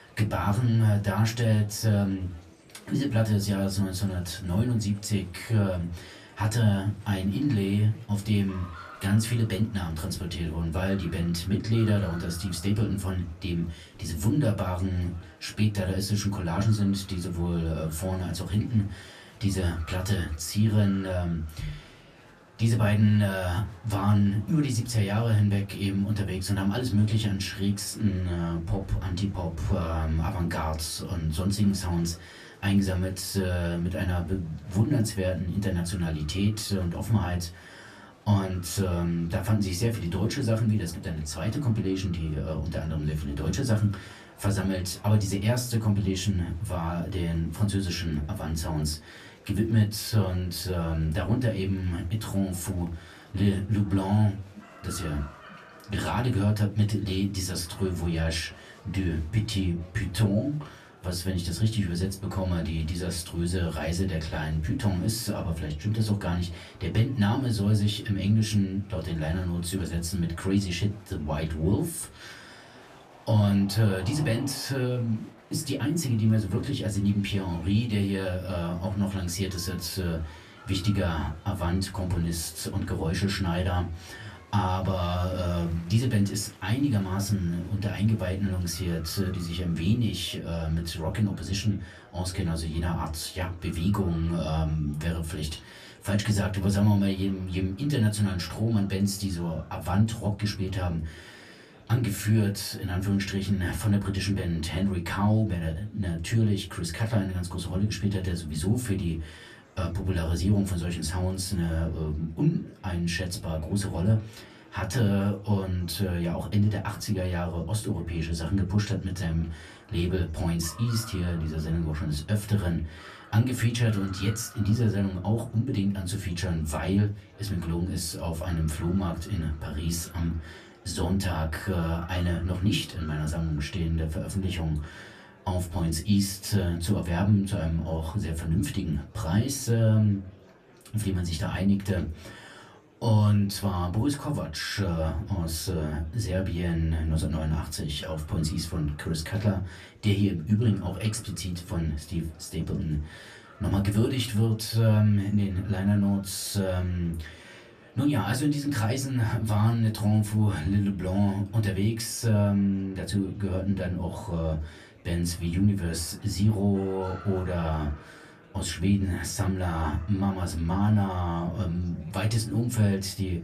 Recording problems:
off-mic speech; far
room echo; very slight; dies away in 0.2 s
murmuring crowd; faint; throughout; 25 dB below the speech

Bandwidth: 14.5 kHz